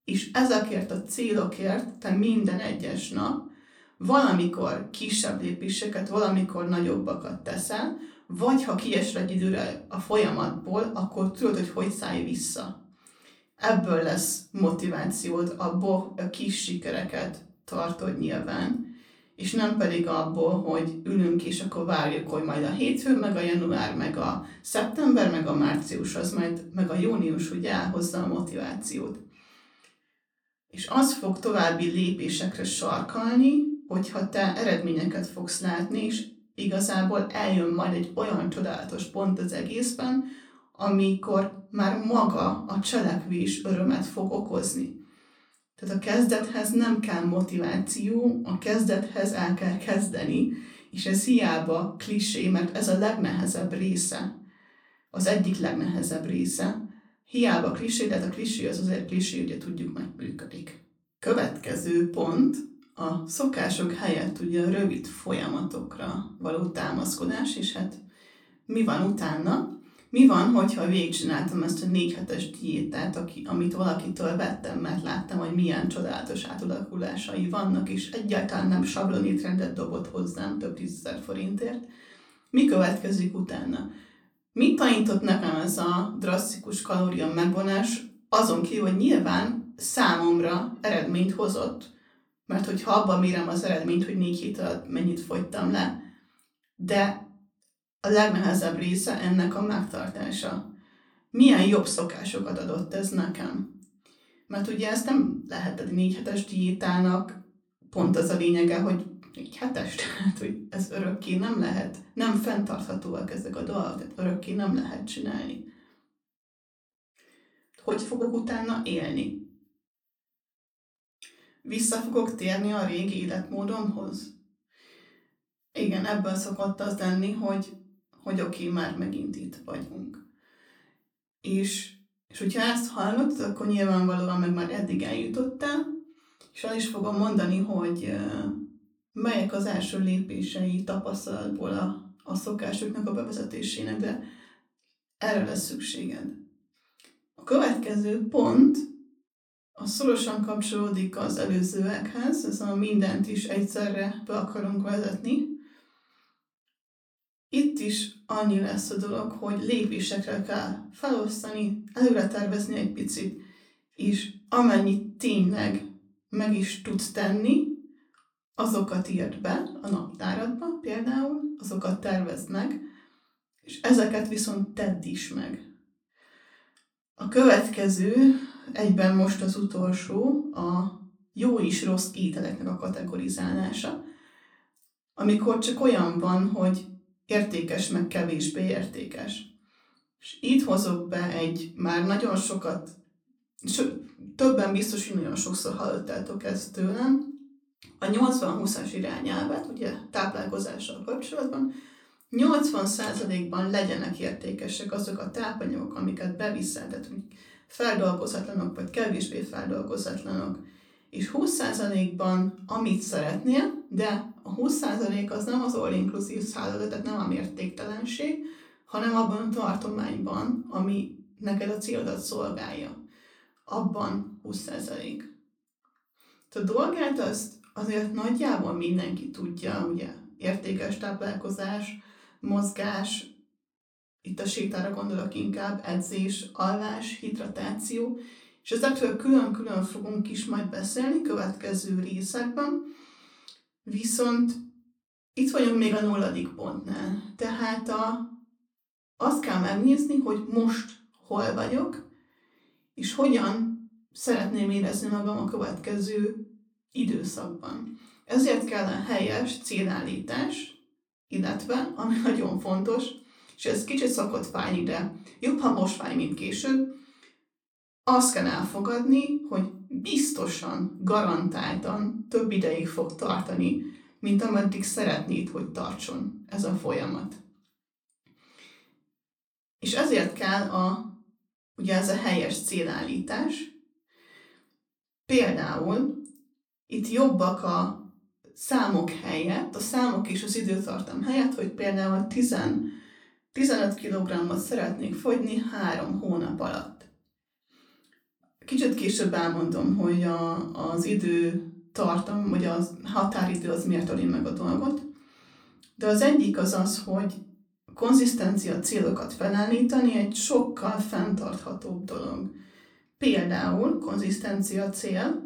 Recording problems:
off-mic speech; far
room echo; very slight; dies away in 0.3 s

